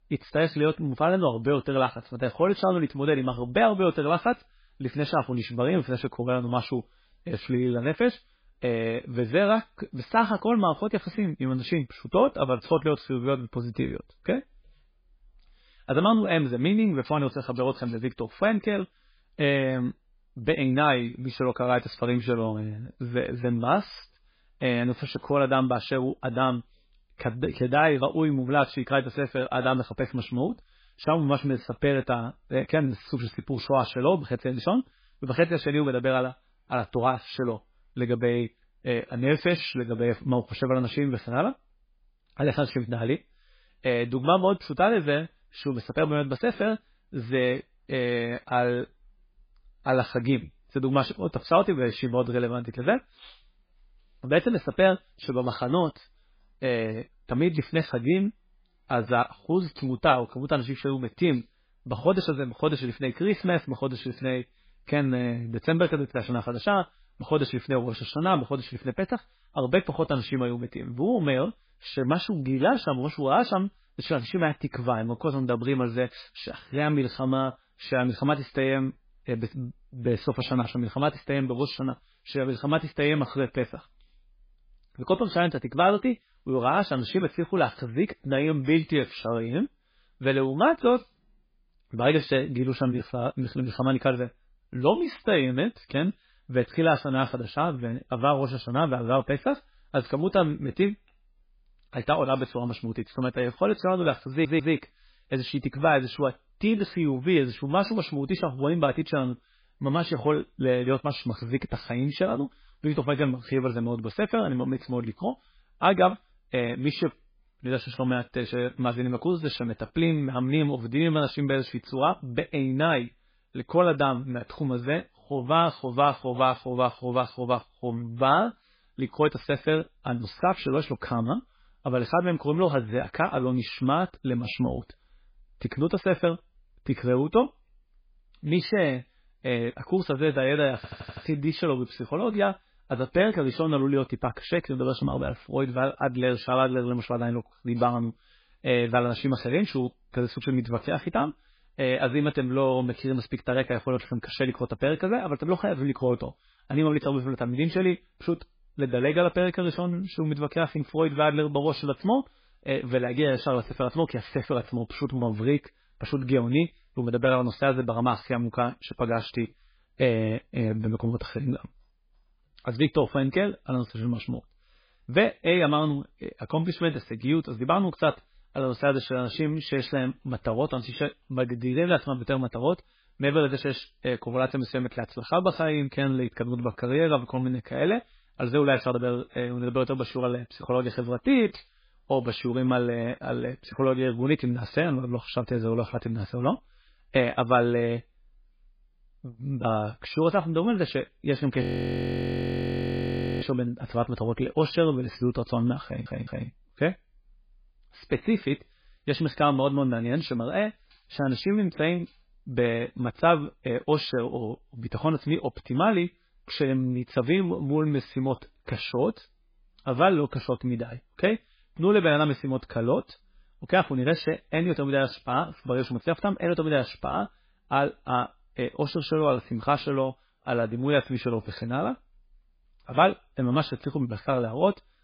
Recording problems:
garbled, watery; badly
audio stuttering; at 1:44, at 2:21 and at 3:26
audio freezing; at 3:22 for 2 s

